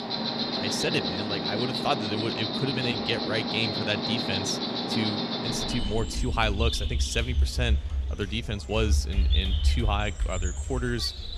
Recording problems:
animal sounds; very loud; throughout; 1 dB above the speech
murmuring crowd; faint; throughout; 20 dB below the speech

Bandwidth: 13.5 kHz